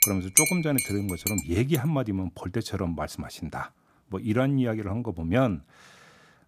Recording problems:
household noises; very faint; until 1.5 s; 3 dB above the speech

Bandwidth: 14.5 kHz